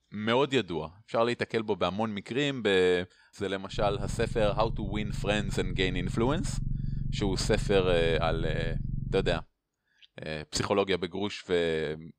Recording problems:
low rumble; noticeable; from 3.5 to 9.5 s; 15 dB below the speech

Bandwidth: 15.5 kHz